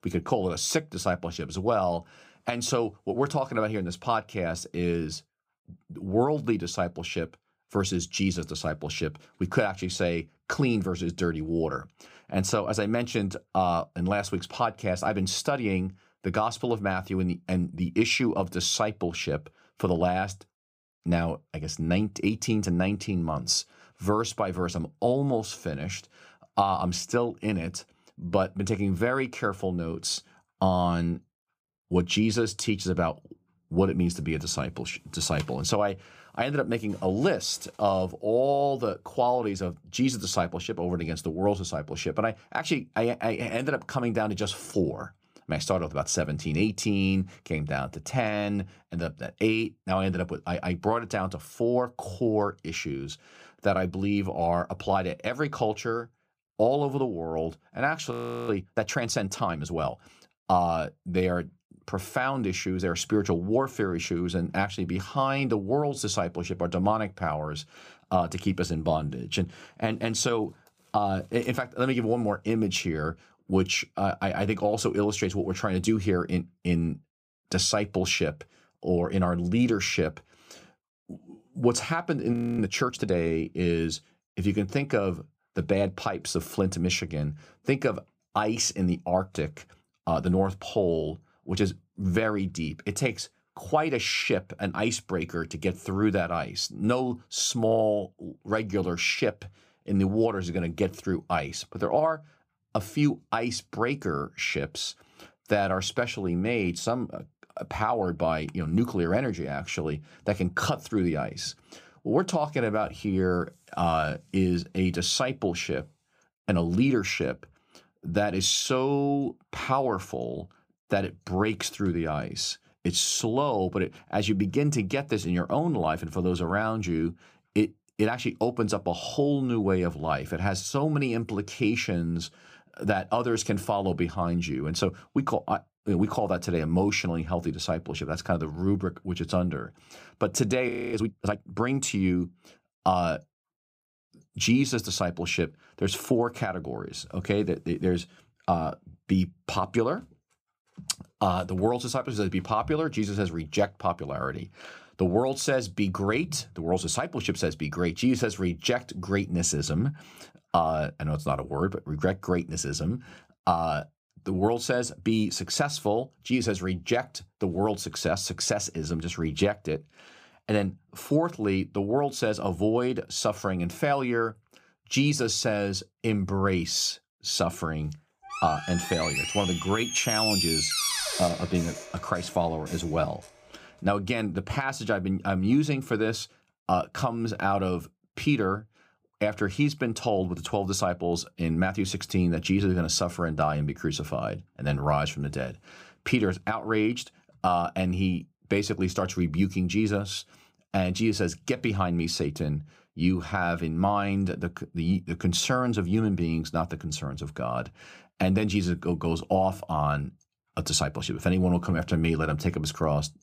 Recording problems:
audio freezing; at 58 s, at 1:22 and at 2:21
door banging; loud; from 2:58 to 3:03; peak 4 dB above the speech

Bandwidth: 15 kHz